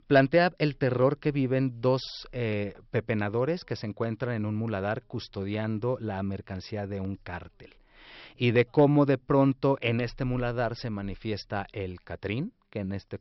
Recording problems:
high frequencies cut off; noticeable; nothing above 5.5 kHz

